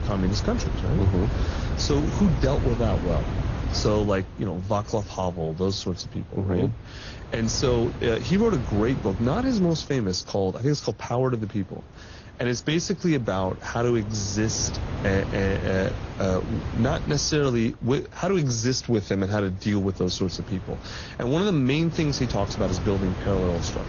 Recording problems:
garbled, watery; slightly; nothing above 6.5 kHz
wind noise on the microphone; occasional gusts; 10 dB below the speech

